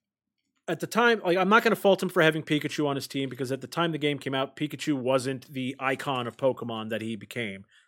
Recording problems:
none

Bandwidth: 16.5 kHz